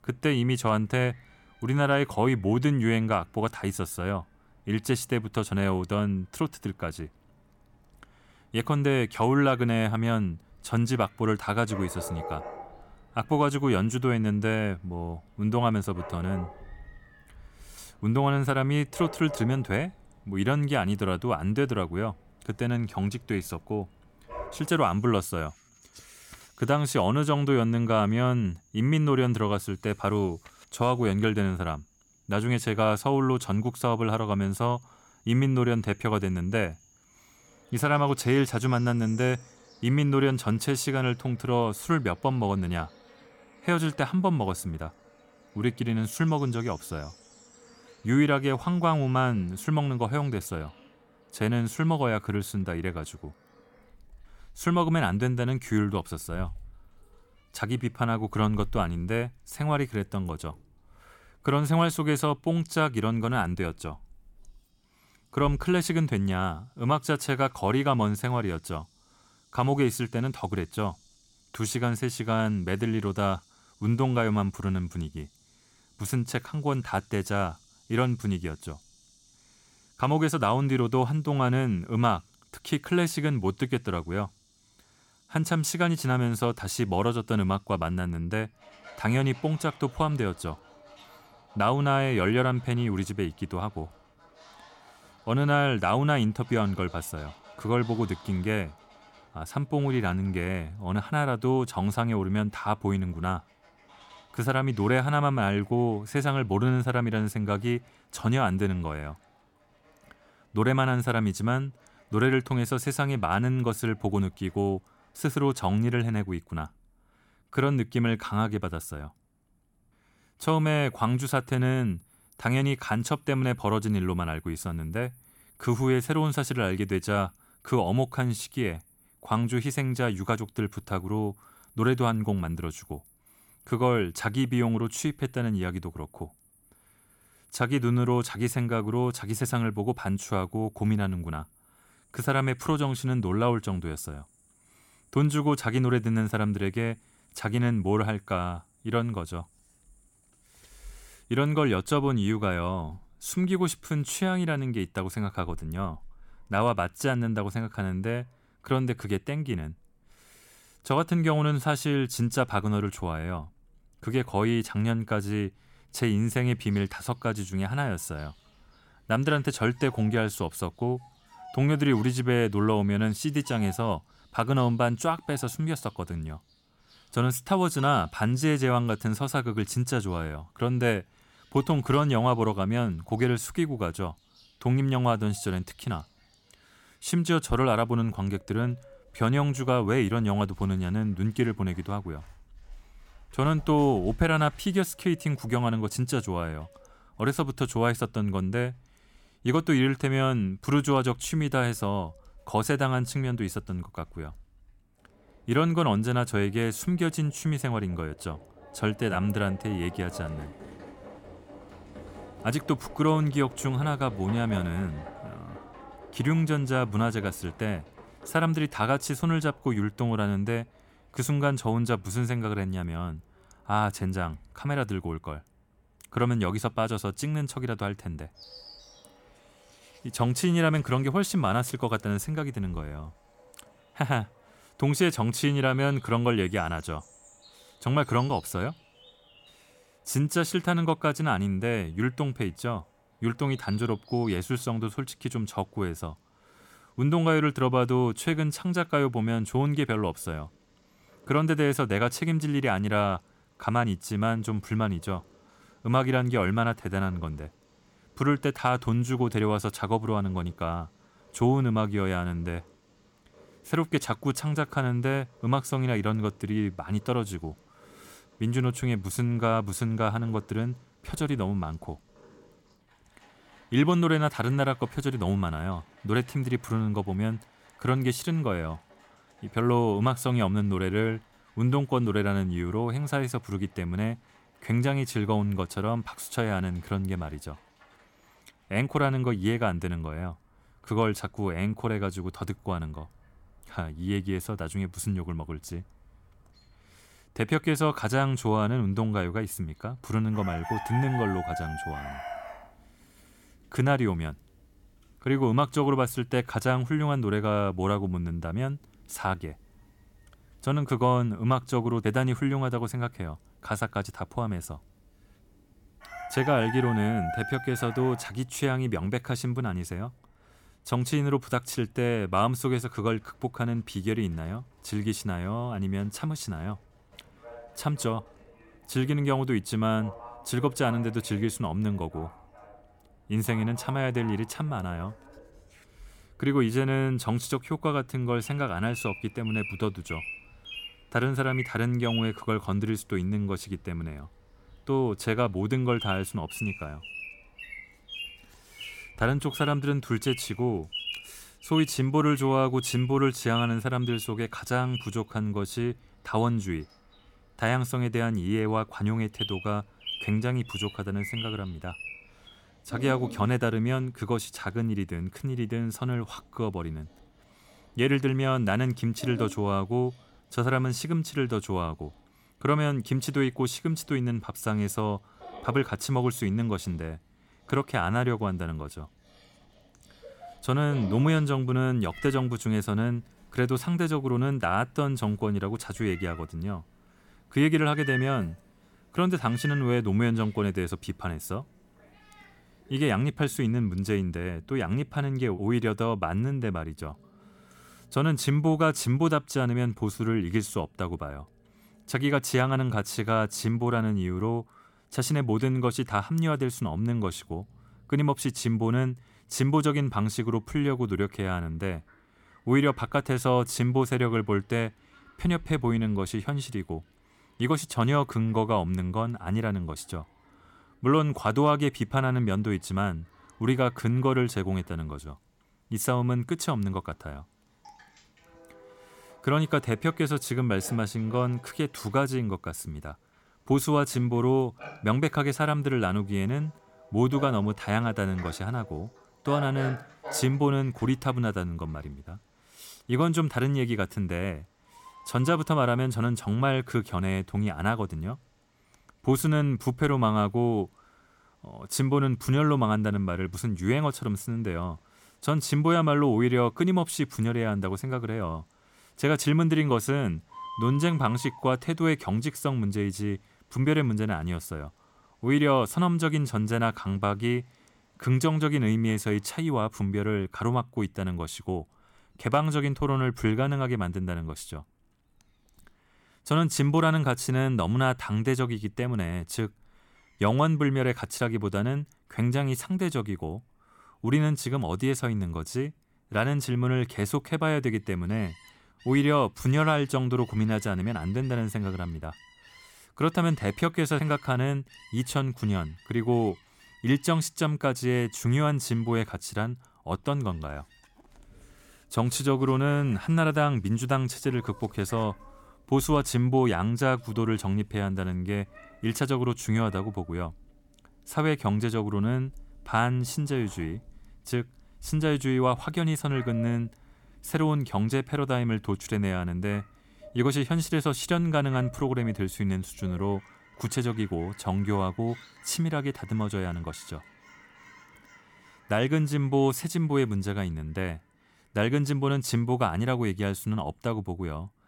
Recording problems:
animal sounds; noticeable; throughout; 20 dB below the speech

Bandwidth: 17.5 kHz